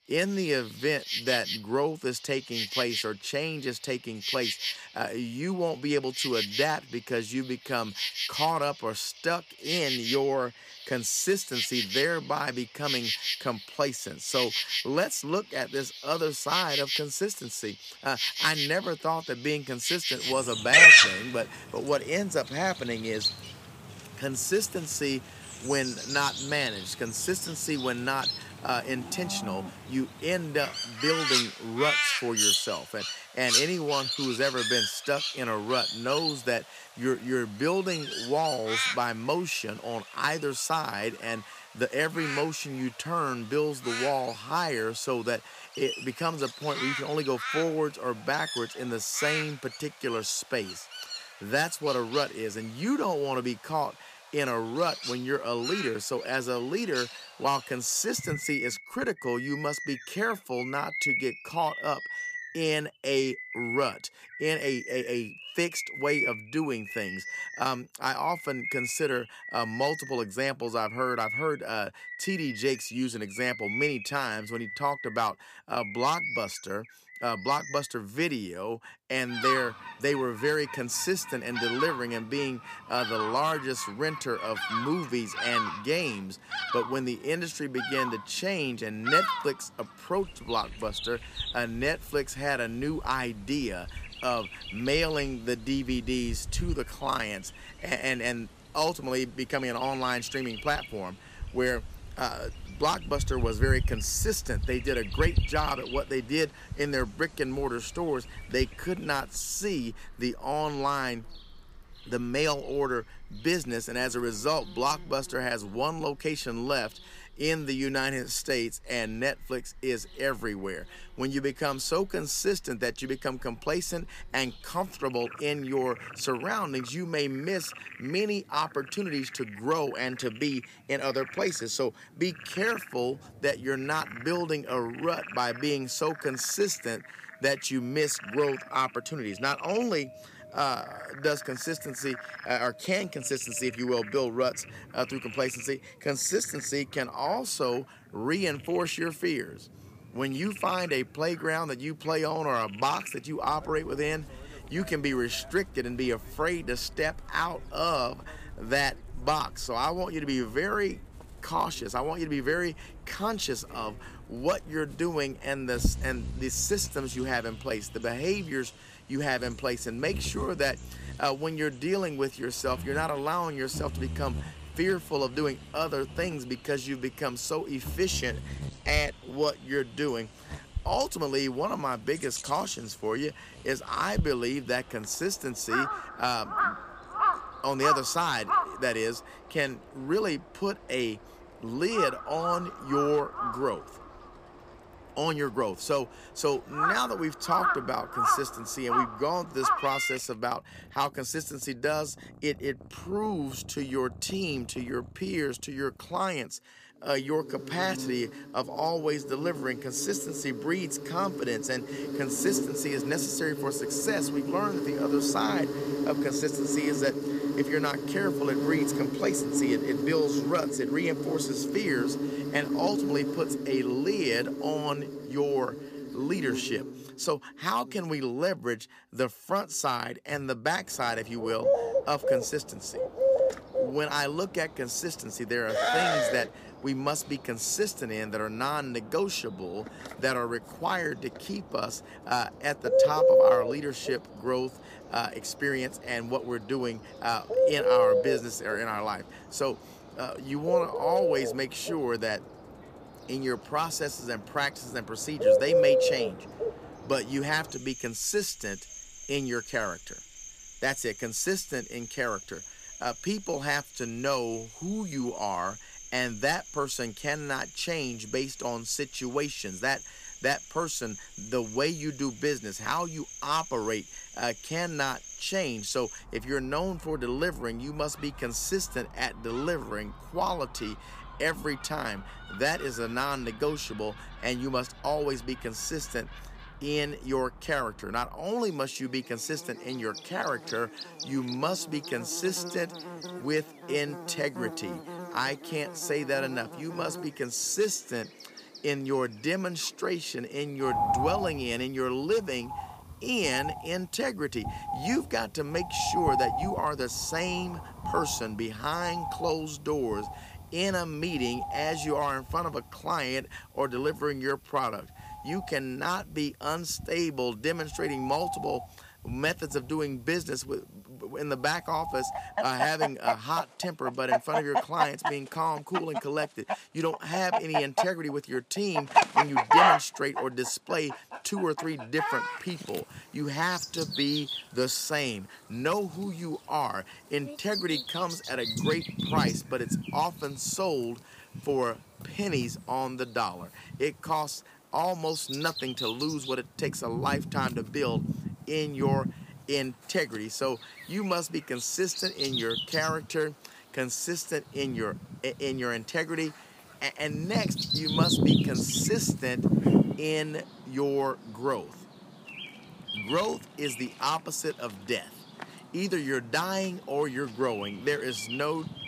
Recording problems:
animal sounds; very loud; throughout; as loud as the speech

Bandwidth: 15 kHz